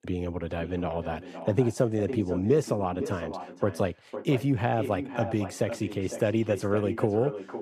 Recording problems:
echo of what is said; strong; throughout; 510 ms later, 10 dB below the speech

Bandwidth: 15 kHz